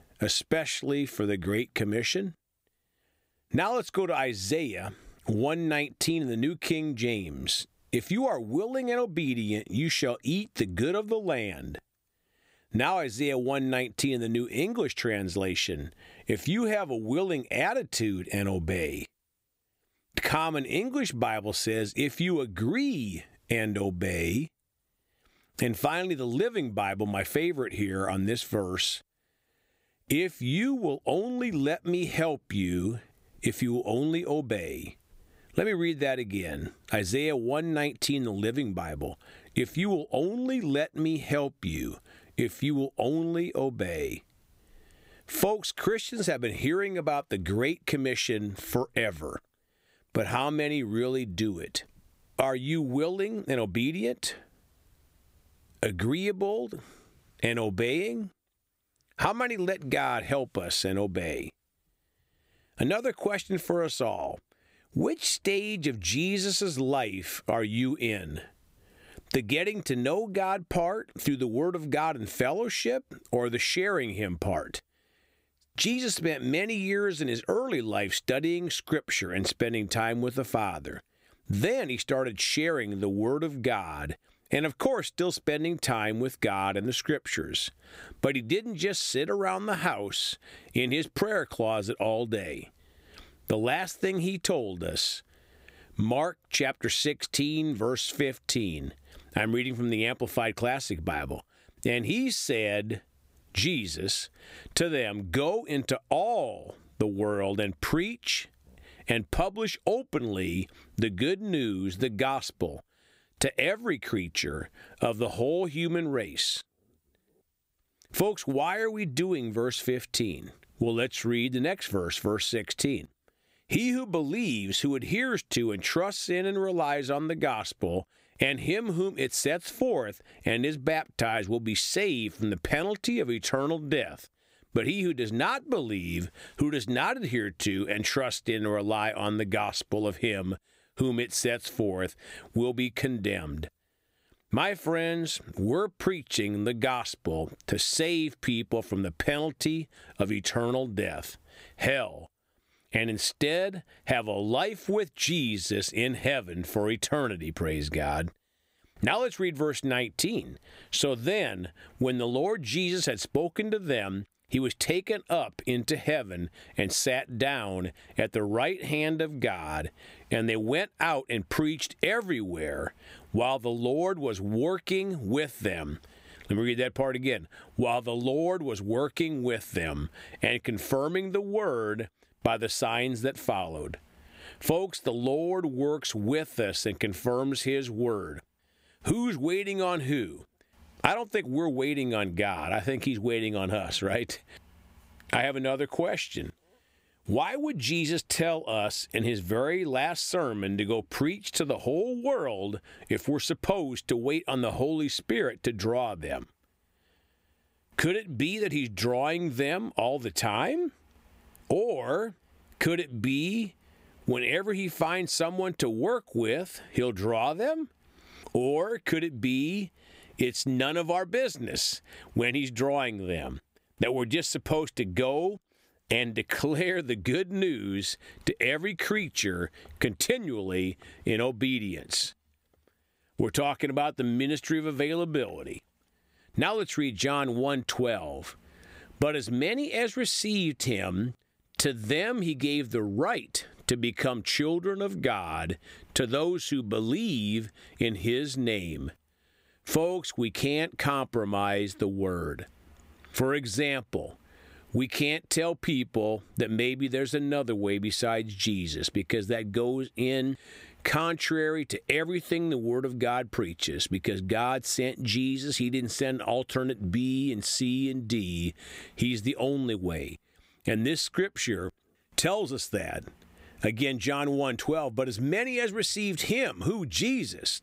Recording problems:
squashed, flat; somewhat

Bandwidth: 15.5 kHz